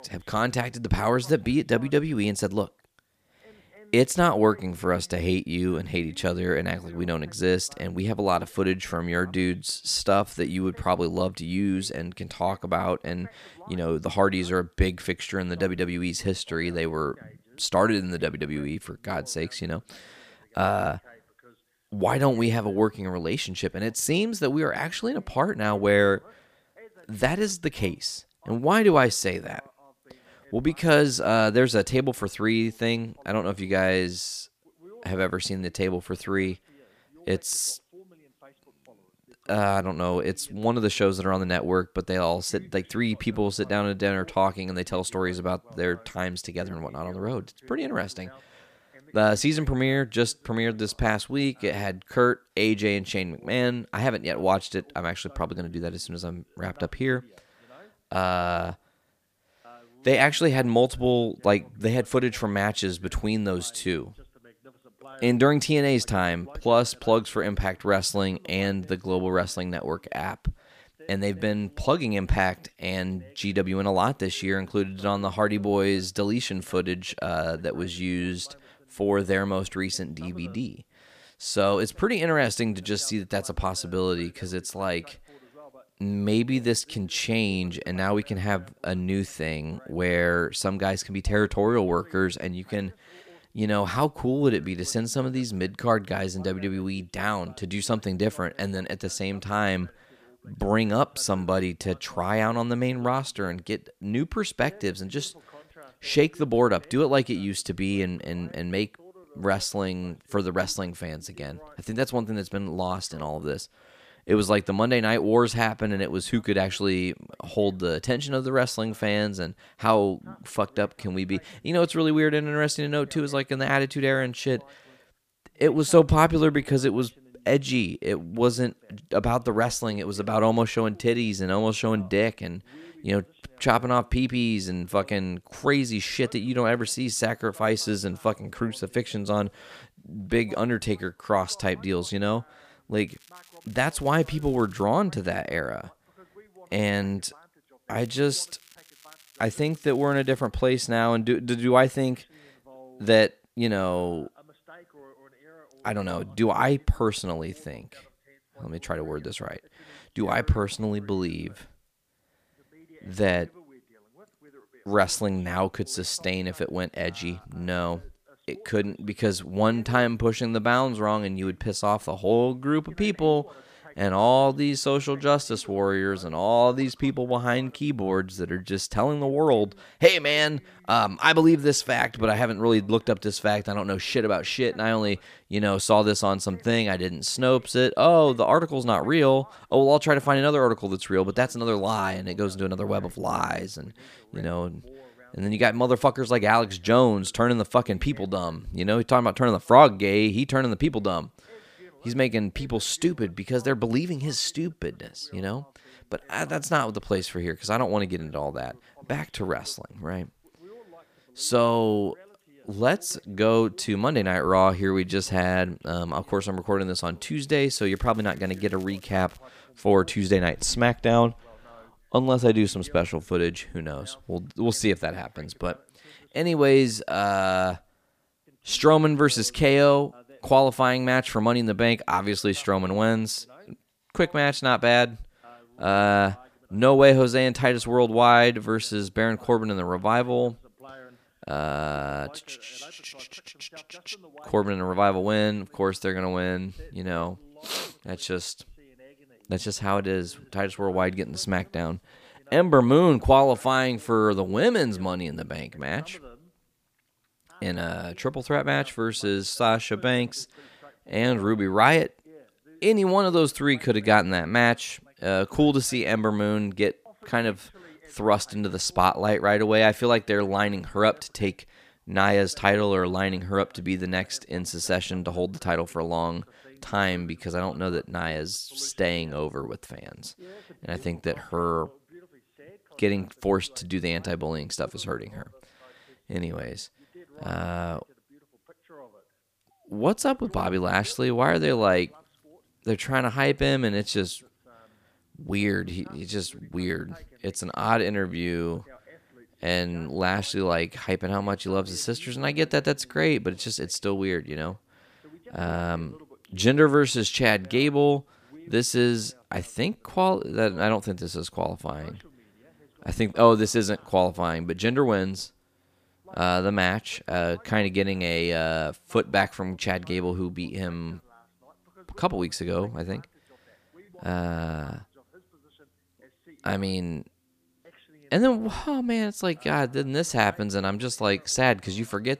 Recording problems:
voice in the background; faint; throughout; 30 dB below the speech
crackling; faint; from 2:23 to 2:25, from 2:28 to 2:30 and from 3:38 to 3:39; 30 dB below the speech

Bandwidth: 15 kHz